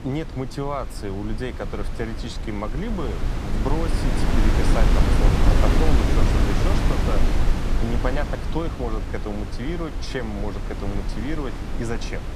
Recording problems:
wind noise on the microphone; heavy; 1 dB above the speech

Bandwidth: 14.5 kHz